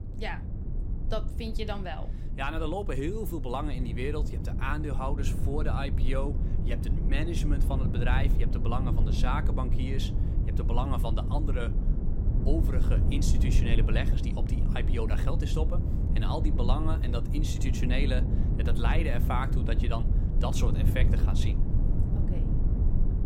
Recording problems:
low rumble; loud; throughout; 6 dB below the speech

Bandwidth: 16 kHz